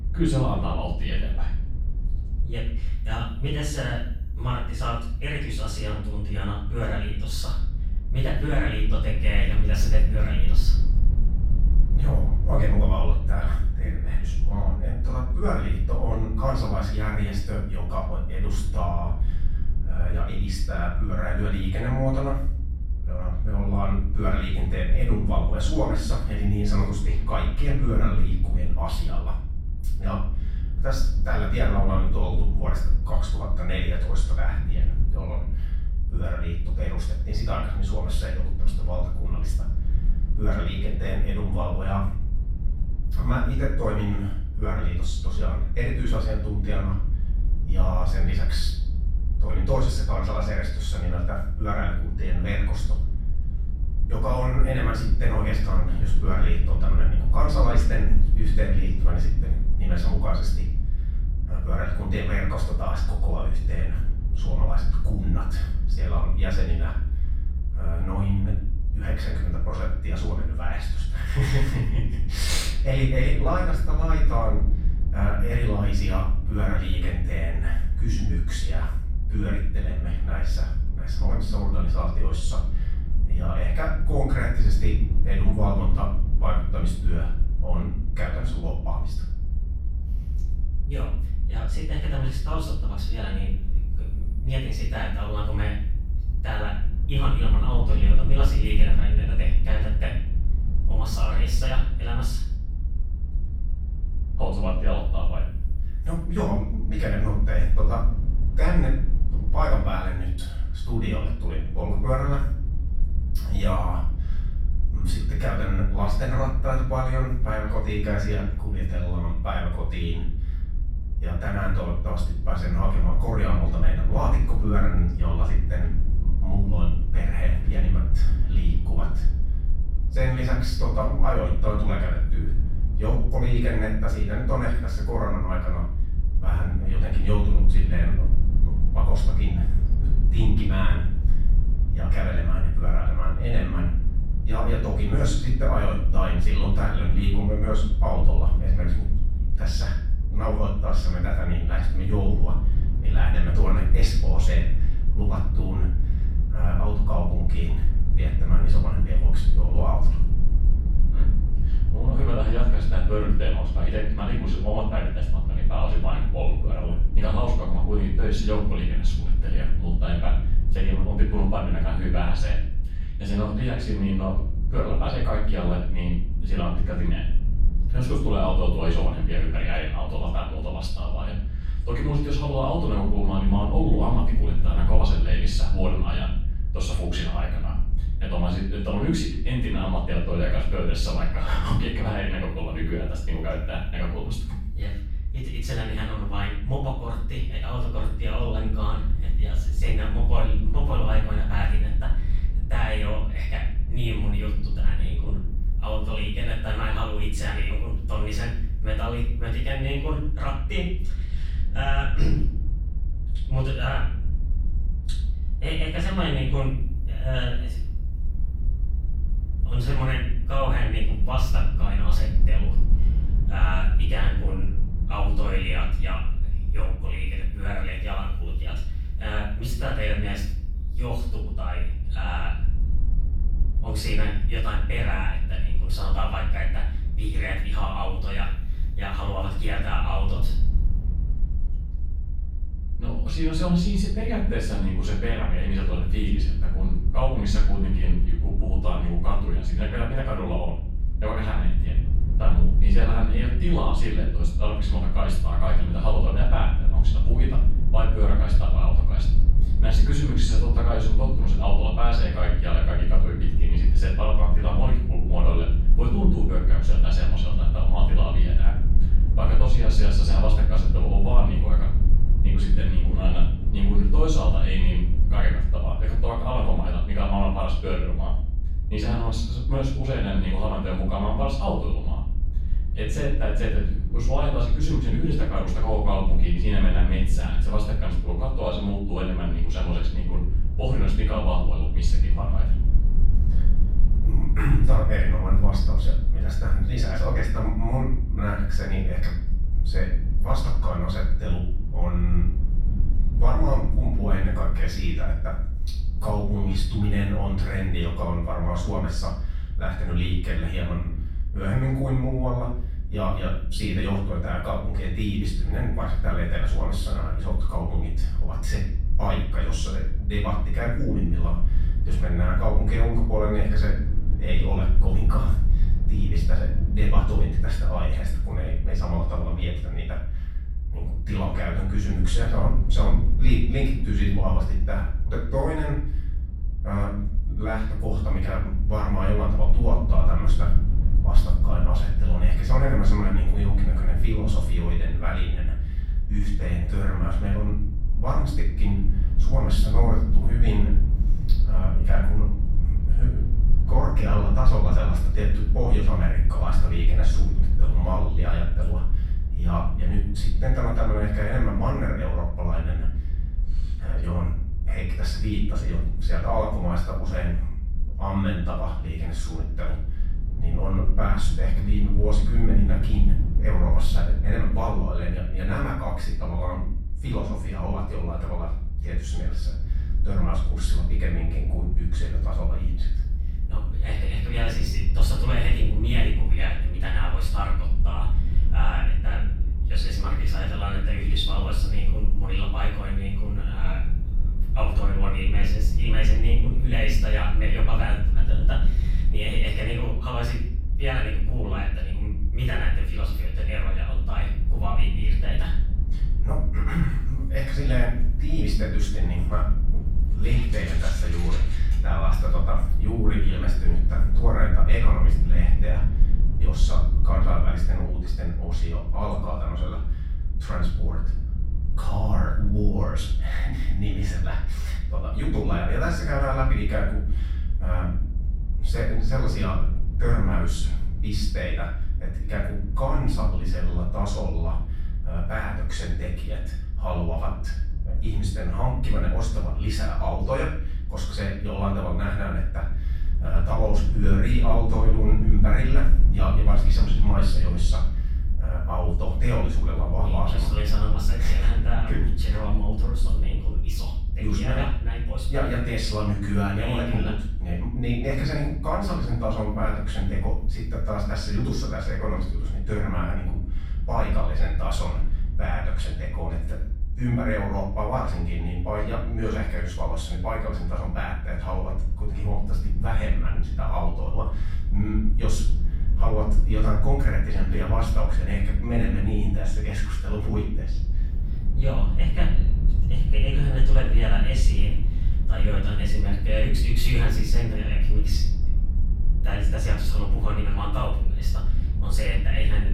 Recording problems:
off-mic speech; far
room echo; noticeable; dies away in 0.6 s
low rumble; noticeable; throughout; 10 dB below the speech

